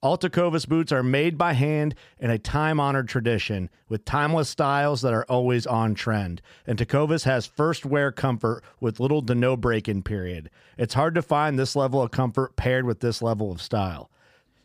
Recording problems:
none

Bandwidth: 15 kHz